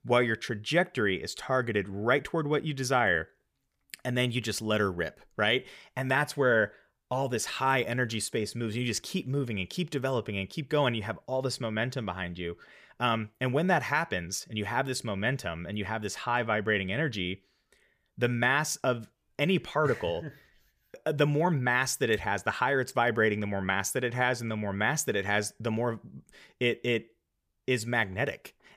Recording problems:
none

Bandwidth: 15 kHz